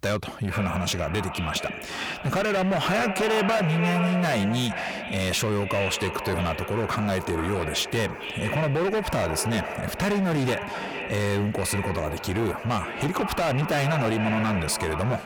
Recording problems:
distortion; heavy; 23% of the sound clipped
echo of what is said; strong; throughout; 450 ms later, 7 dB below the speech

